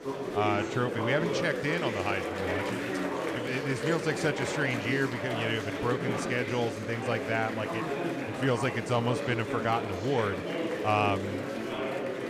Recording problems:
murmuring crowd; loud; throughout; 2 dB below the speech

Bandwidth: 14.5 kHz